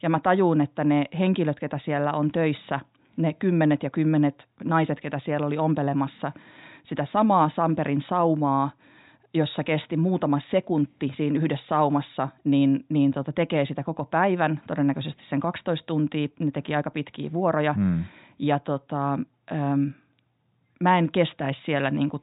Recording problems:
high frequencies cut off; severe; nothing above 4 kHz

